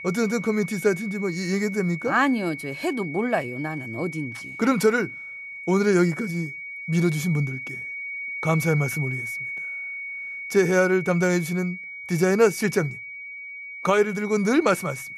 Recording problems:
high-pitched whine; loud; throughout; 2 kHz, 9 dB below the speech

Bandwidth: 13.5 kHz